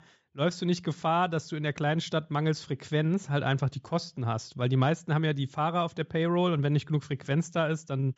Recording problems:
high frequencies cut off; noticeable; nothing above 8 kHz

